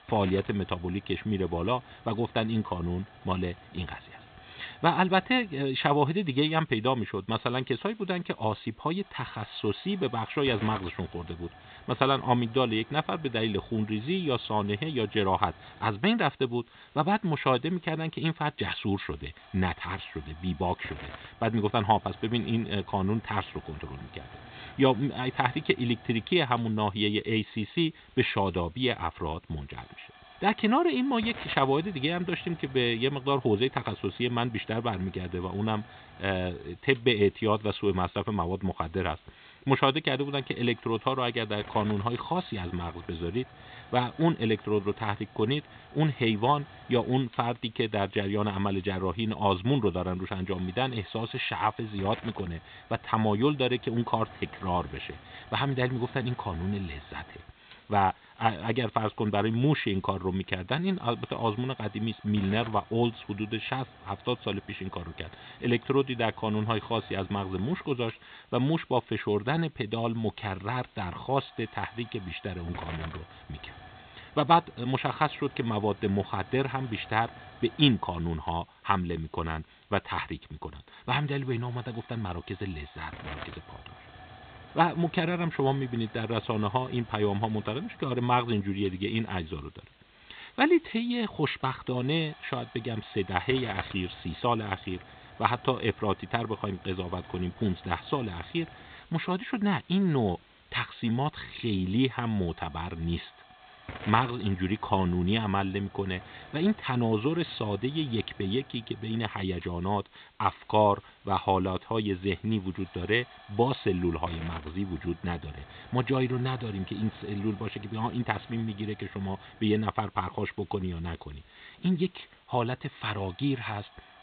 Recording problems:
high frequencies cut off; severe; nothing above 4 kHz
hiss; faint; throughout; 20 dB below the speech

